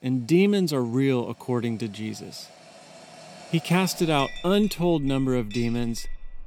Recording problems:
household noises; noticeable; throughout; 20 dB below the speech

